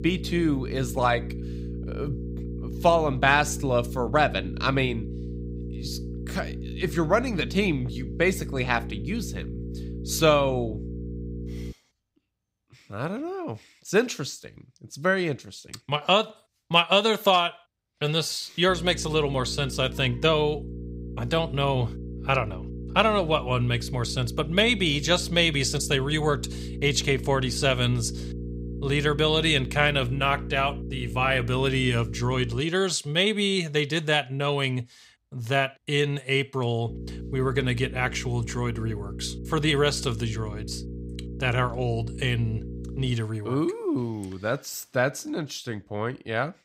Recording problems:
electrical hum; noticeable; until 12 s, from 19 to 33 s and from 37 to 43 s; 60 Hz, 20 dB below the speech

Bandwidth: 15.5 kHz